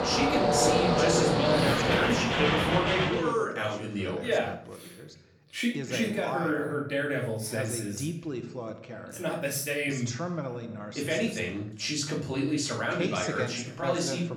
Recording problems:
off-mic speech; far
room echo; slight; dies away in 0.5 s
train or aircraft noise; very loud; until 3 s; 4 dB above the speech
voice in the background; loud; throughout; 7 dB below the speech

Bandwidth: 18 kHz